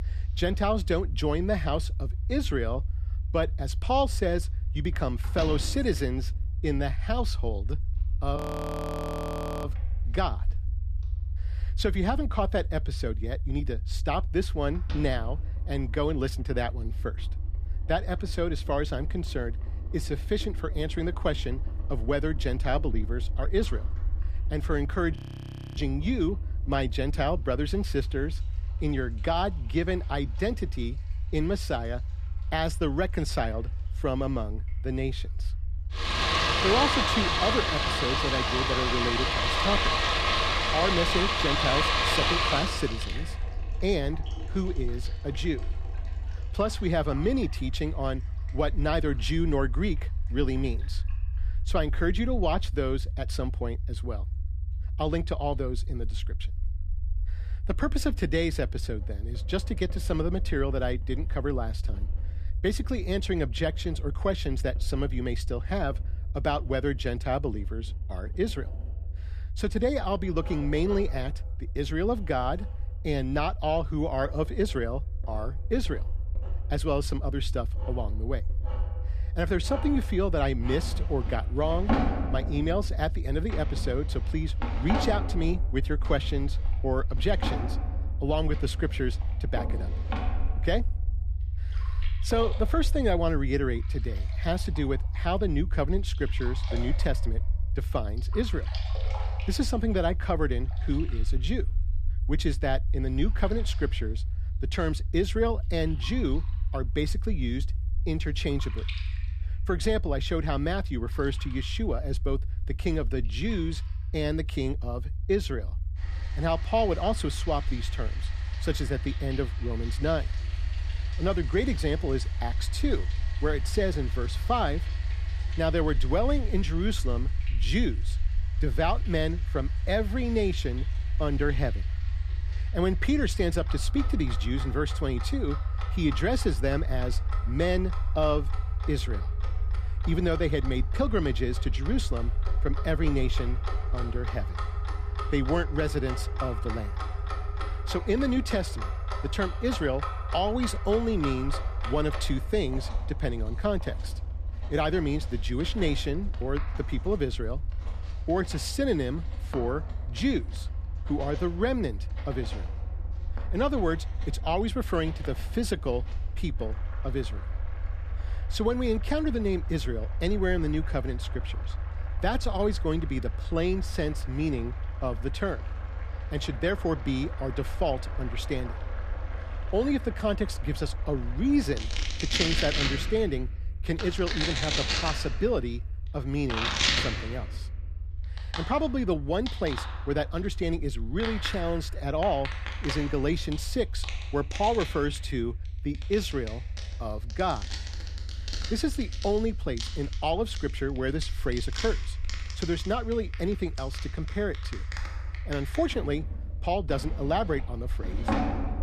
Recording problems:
household noises; loud; throughout; 3 dB below the speech
low rumble; faint; throughout; 20 dB below the speech
audio freezing; at 8.5 s for 1.5 s and at 25 s for 0.5 s

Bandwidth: 14.5 kHz